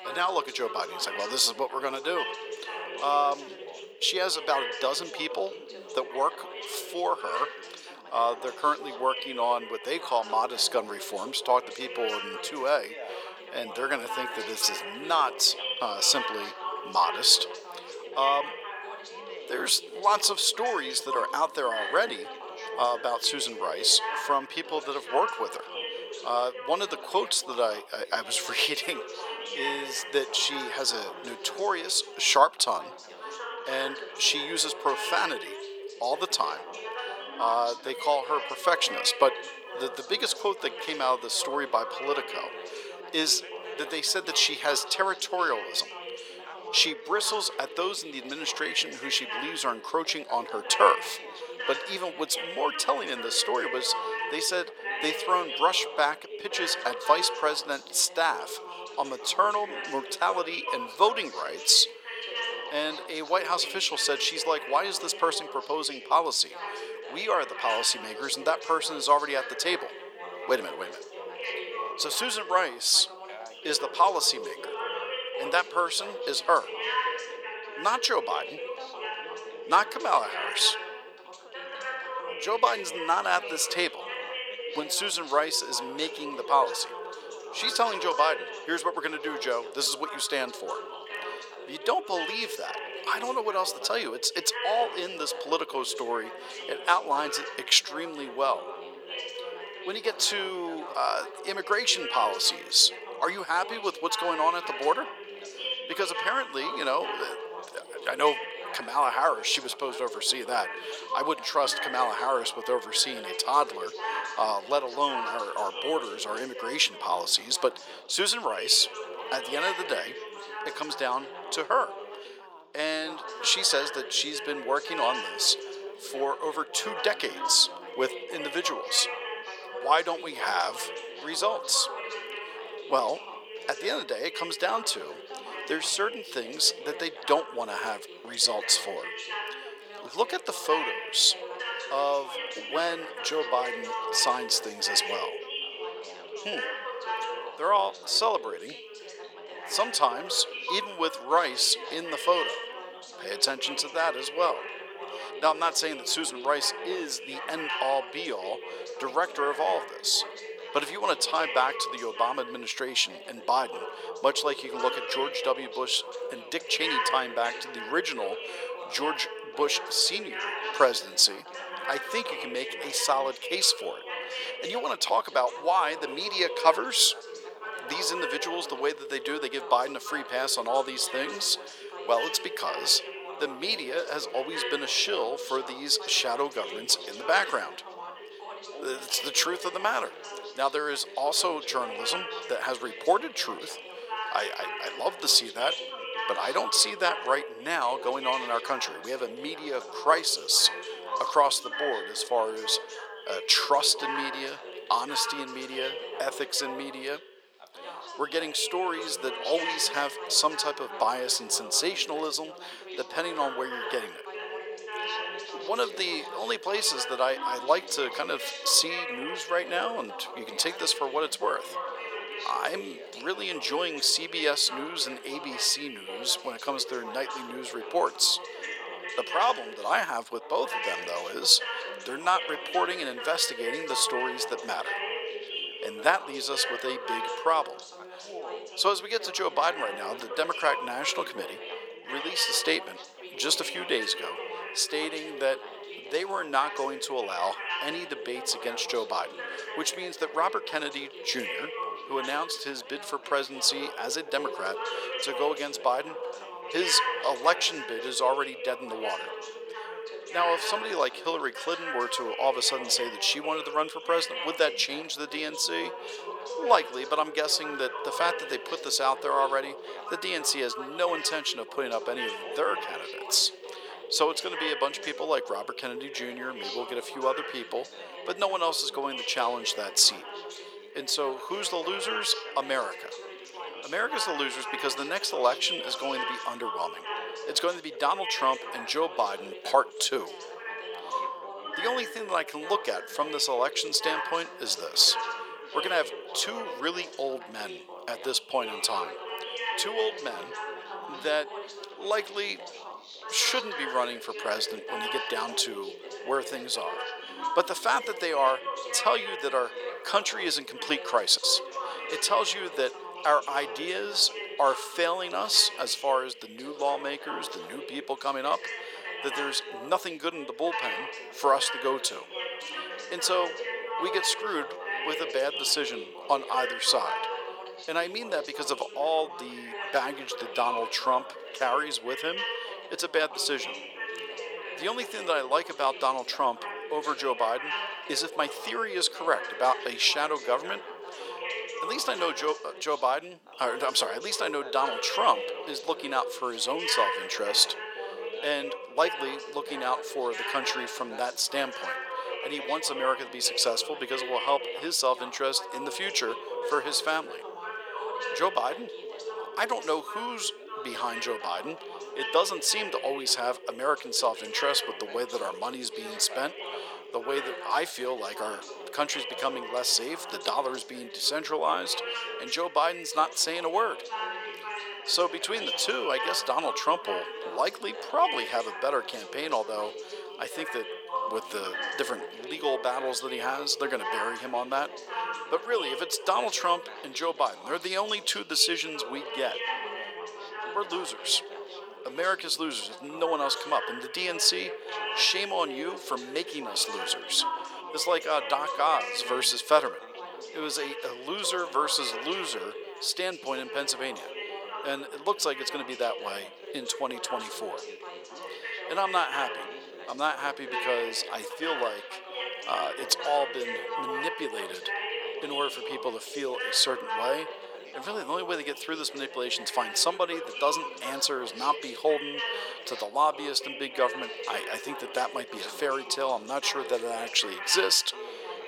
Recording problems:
thin; very; fading below 500 Hz
background chatter; loud; throughout; 4 voices, 9 dB below the speech

